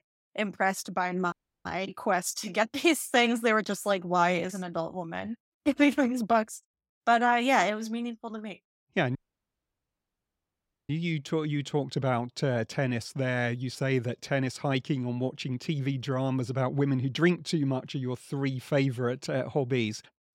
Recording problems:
audio cutting out; at 1.5 s and at 9 s for 1.5 s

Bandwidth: 16 kHz